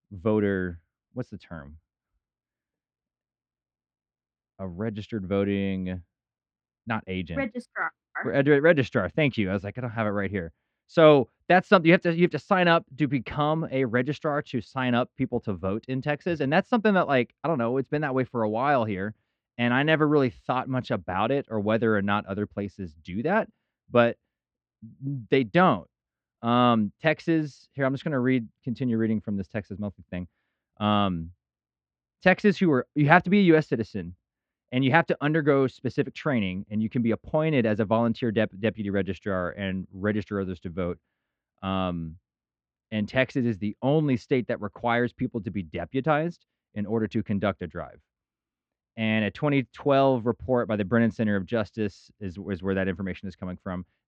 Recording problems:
muffled; slightly; fading above 2.5 kHz

